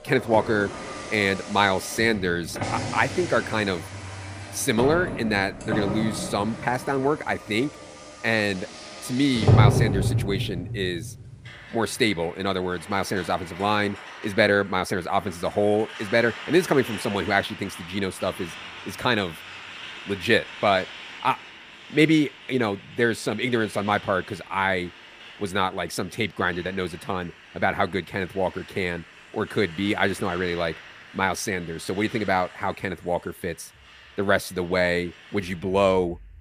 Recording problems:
traffic noise; loud; throughout; 7 dB below the speech

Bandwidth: 15 kHz